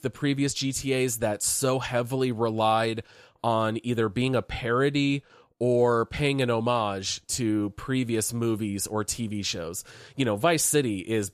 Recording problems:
none

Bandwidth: 14.5 kHz